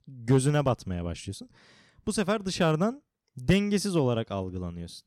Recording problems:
none

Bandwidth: 18 kHz